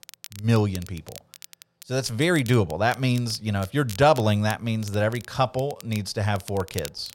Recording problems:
crackle, like an old record; noticeable; 20 dB below the speech

